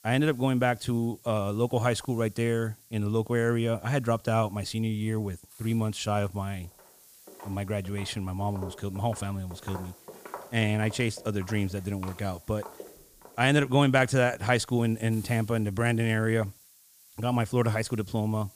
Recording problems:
hiss; faint; throughout; 25 dB below the speech
footsteps; faint; from 7.5 to 13 s; peak 15 dB below the speech

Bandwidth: 15 kHz